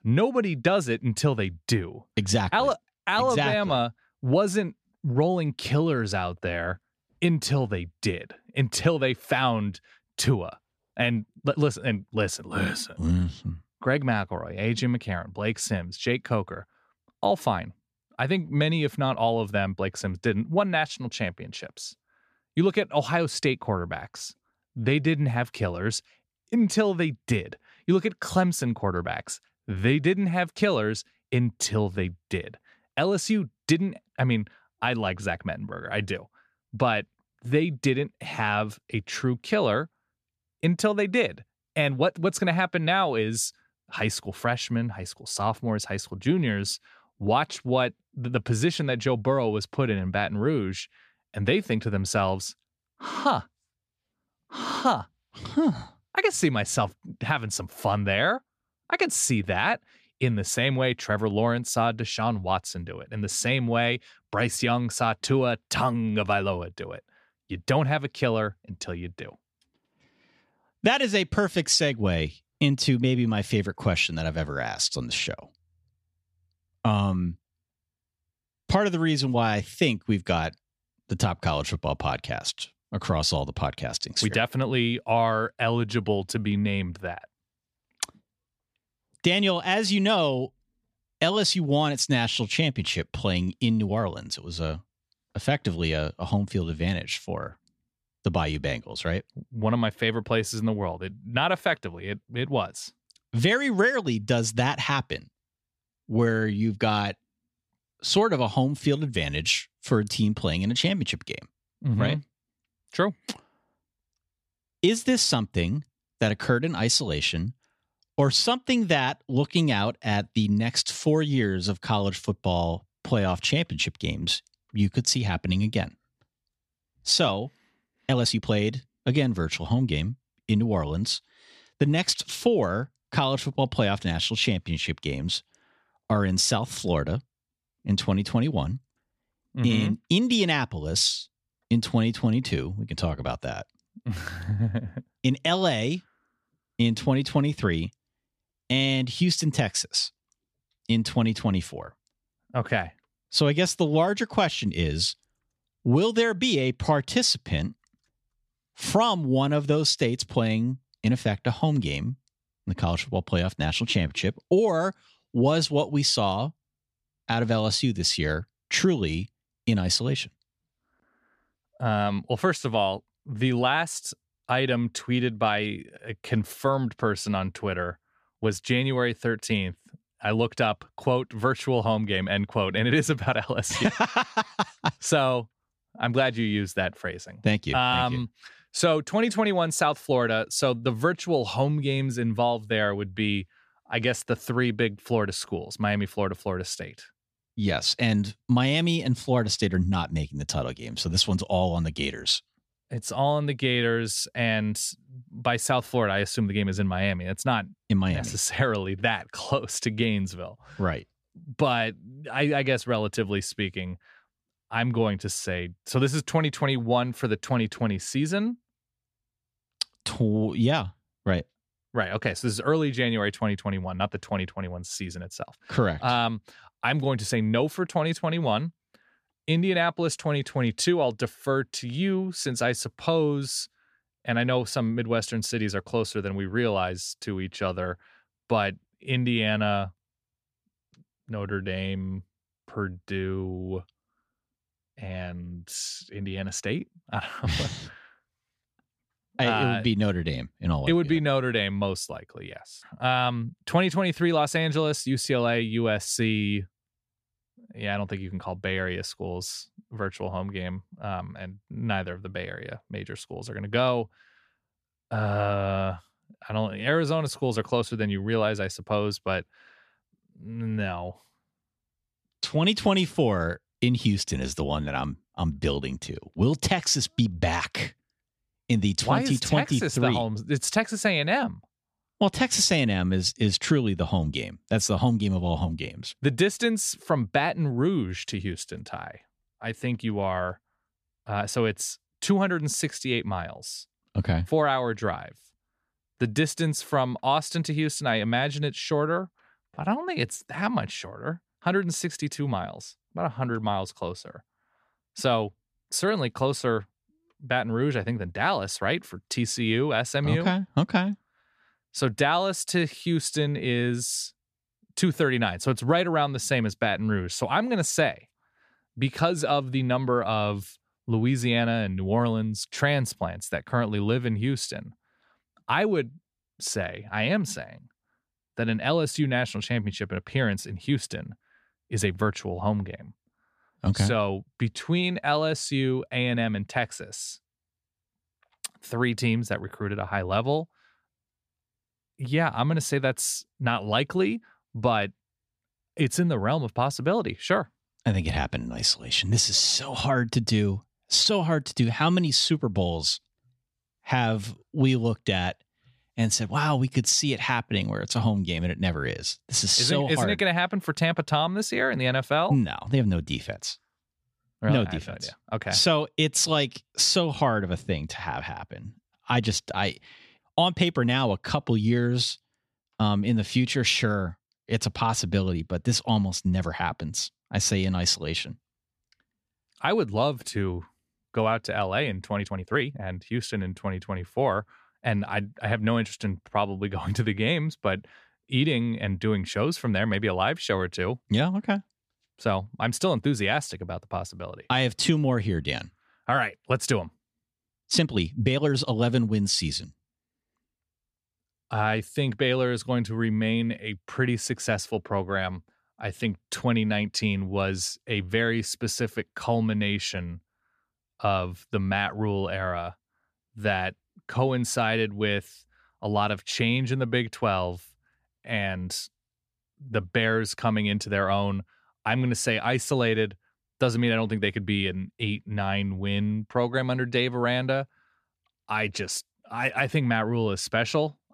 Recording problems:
uneven, jittery; strongly; from 3 s to 6:39

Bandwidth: 14.5 kHz